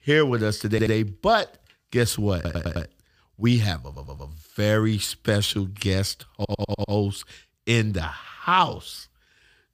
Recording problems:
audio stuttering; 4 times, first at 0.5 s

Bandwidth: 15 kHz